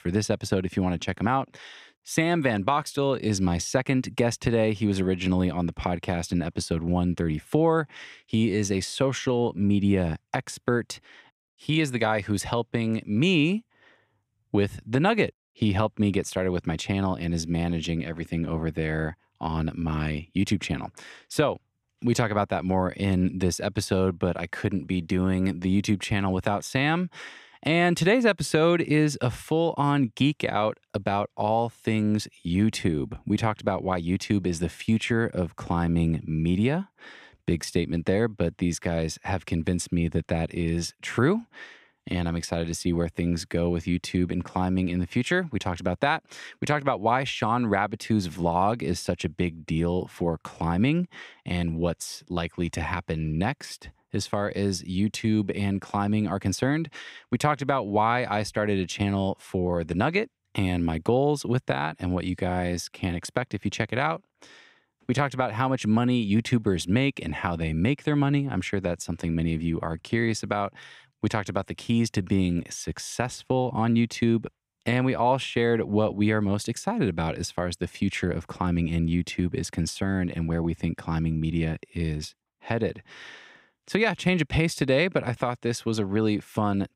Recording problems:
none

